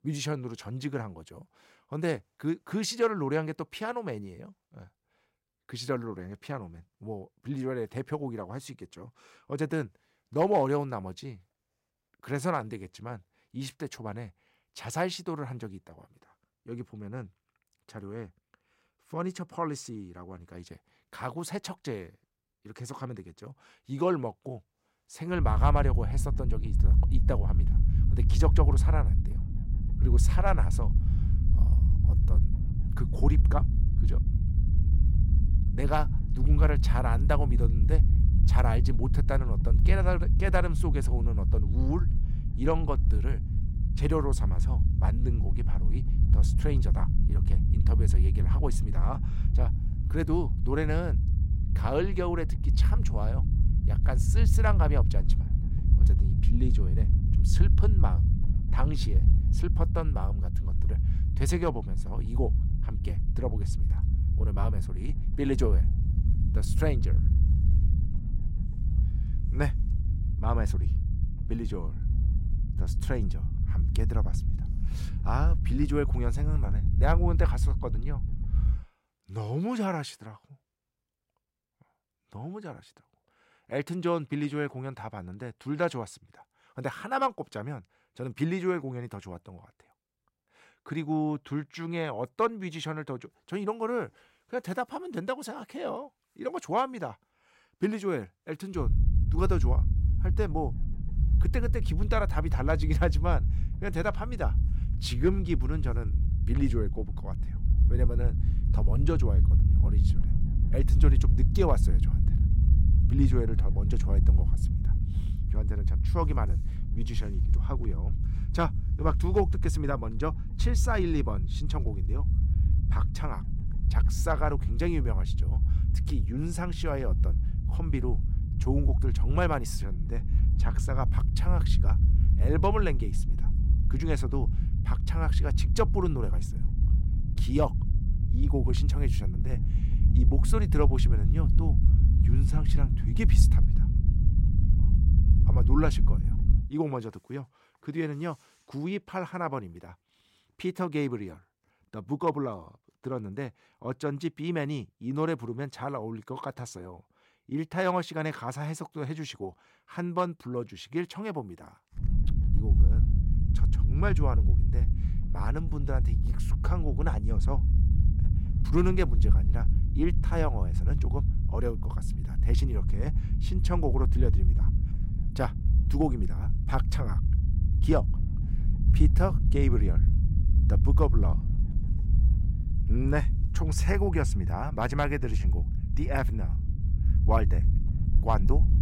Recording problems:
low rumble; loud; from 25 s to 1:19, from 1:39 to 2:27 and from 2:42 on; 10 dB below the speech

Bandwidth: 16 kHz